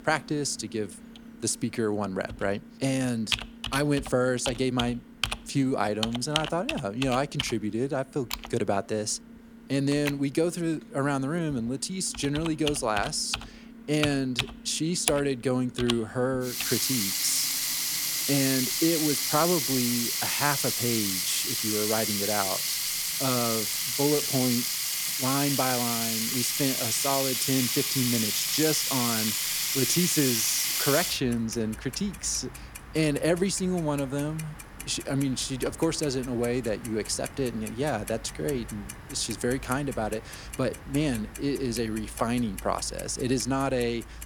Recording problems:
household noises; very loud; throughout; 1 dB above the speech

